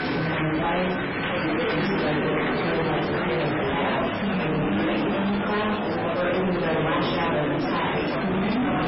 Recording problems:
distortion; heavy; 6 dB below the speech
off-mic speech; far
garbled, watery; badly; nothing above 5.5 kHz
room echo; noticeable; dies away in 0.7 s
murmuring crowd; very loud; throughout; as loud as the speech
background music; loud; throughout; 10 dB below the speech

